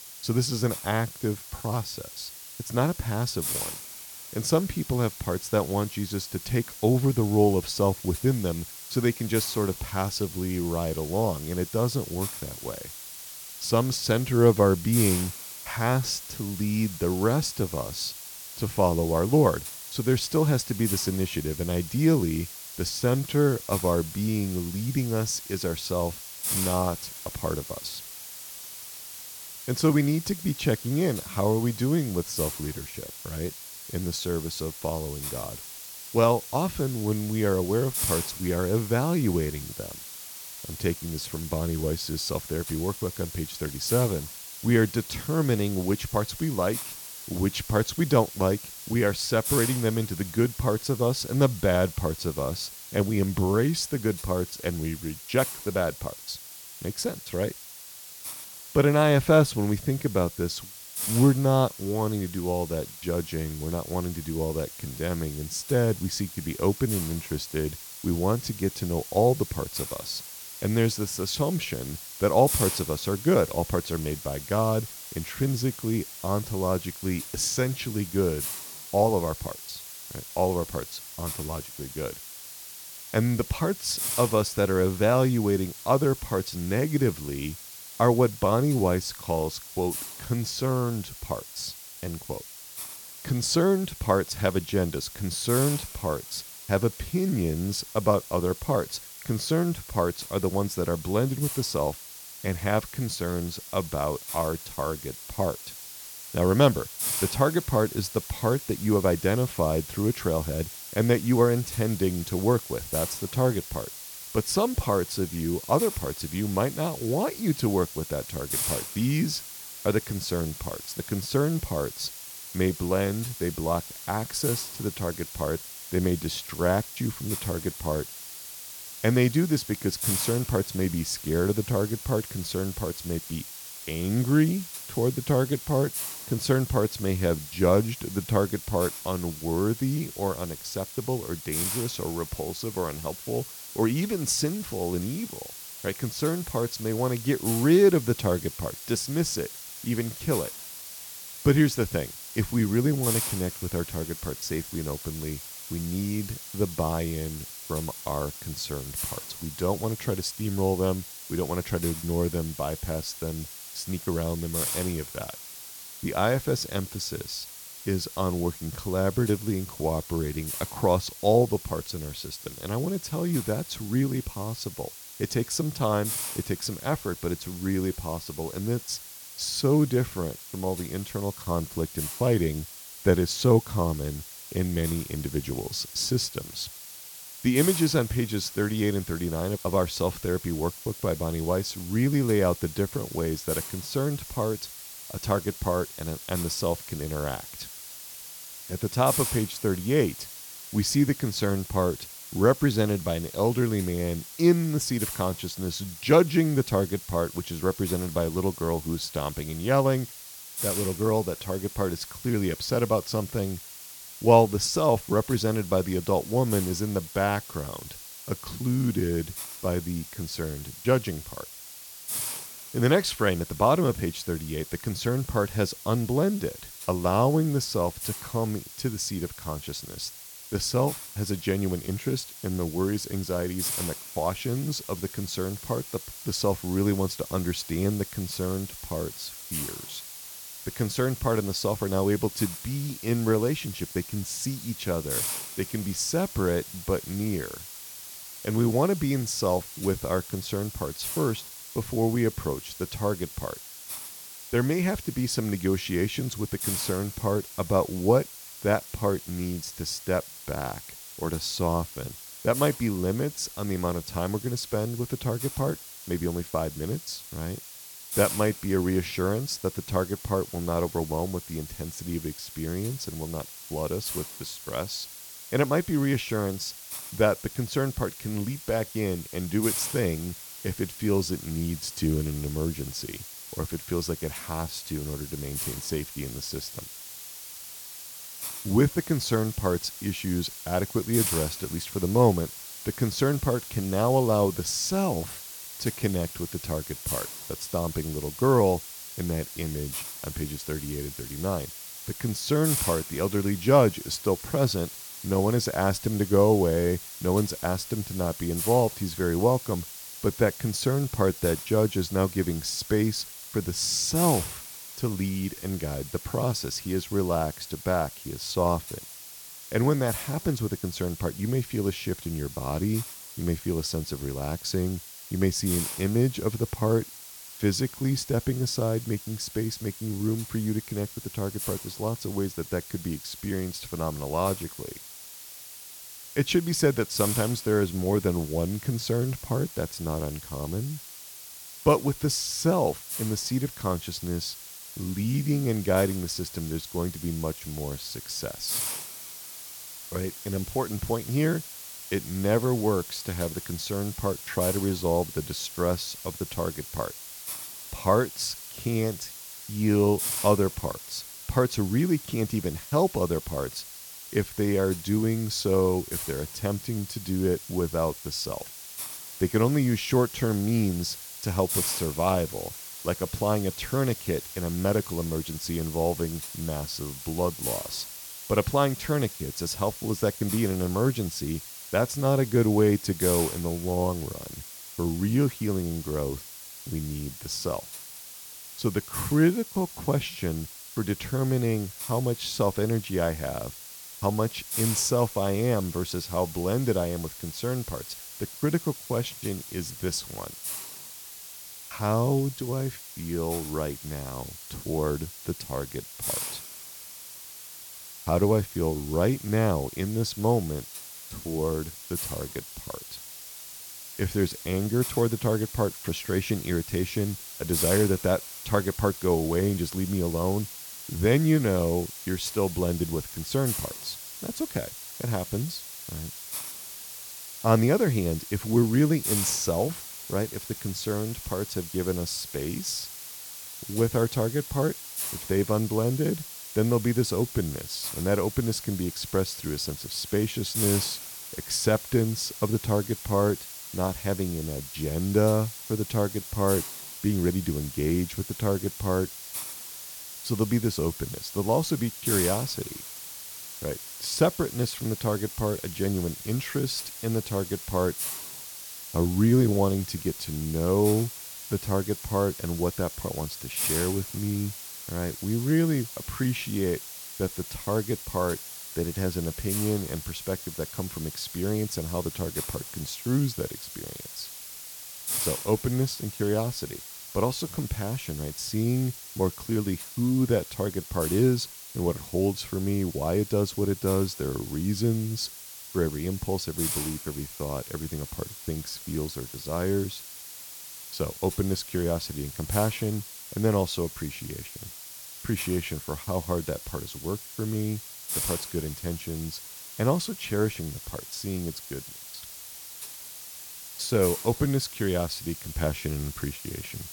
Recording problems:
hiss; loud; throughout; 9 dB below the speech

